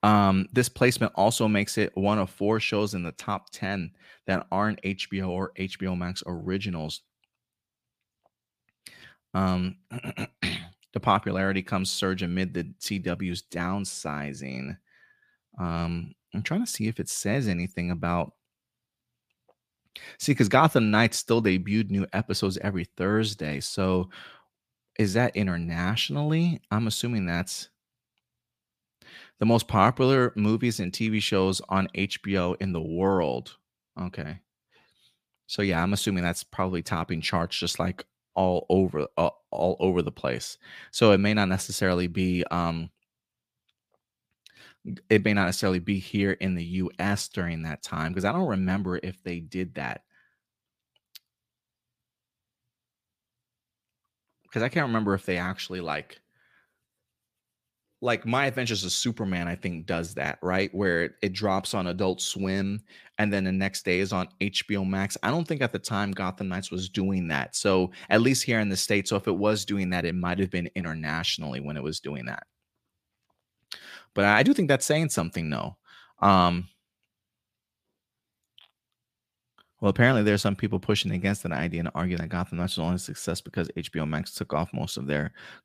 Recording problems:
none

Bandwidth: 15 kHz